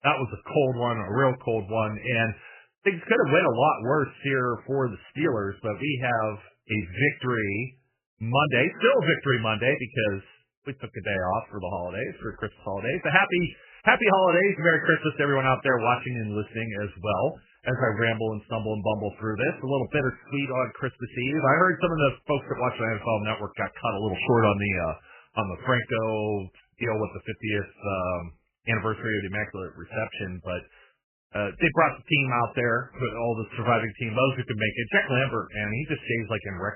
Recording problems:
garbled, watery; badly; nothing above 3 kHz

